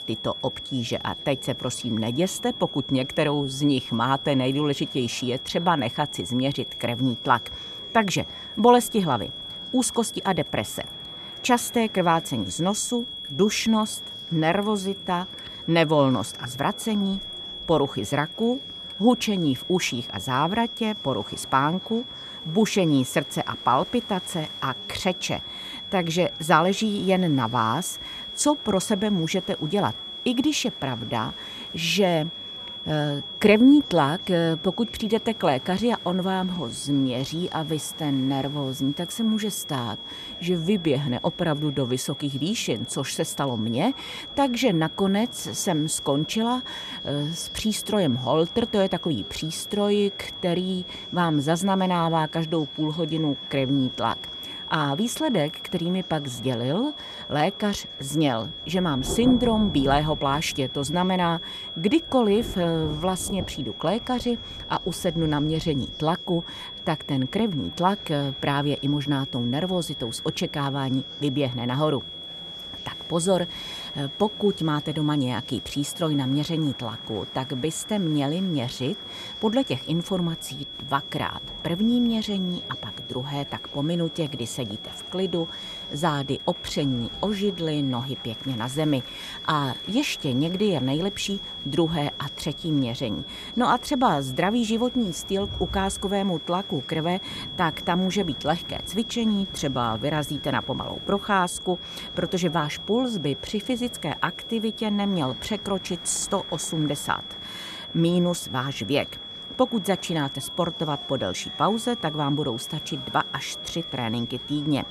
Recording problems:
high-pitched whine; loud; throughout; 3.5 kHz, 9 dB below the speech
rain or running water; faint; throughout; 20 dB below the speech
murmuring crowd; faint; throughout; 25 dB below the speech

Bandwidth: 14.5 kHz